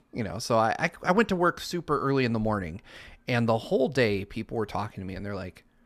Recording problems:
none

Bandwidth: 14 kHz